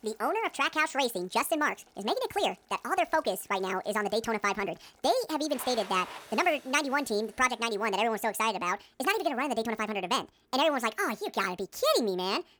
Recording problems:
wrong speed and pitch; too fast and too high; 1.6 times normal speed
household noises; faint; until 9 s; 20 dB below the speech

